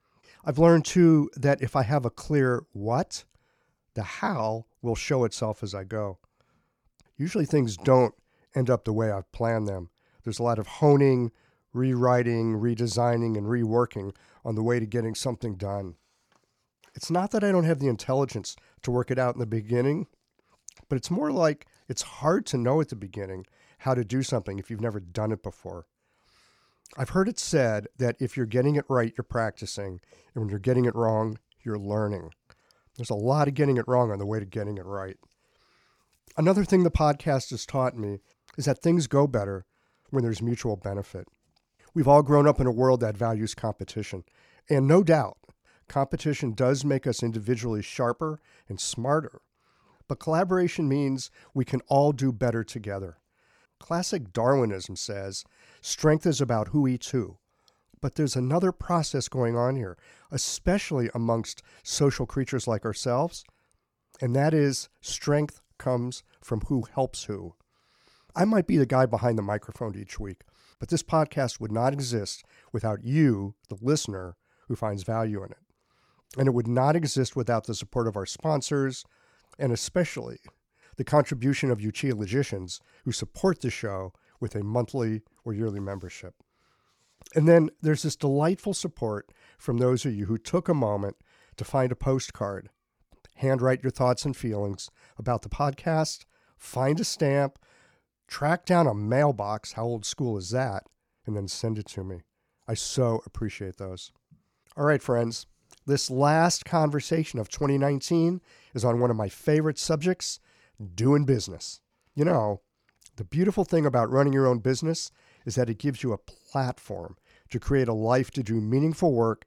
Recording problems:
none

